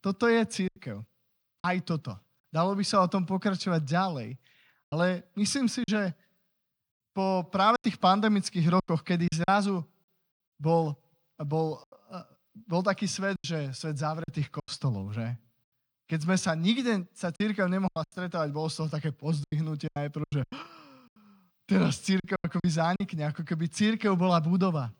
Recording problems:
choppy; very; 8% of the speech affected

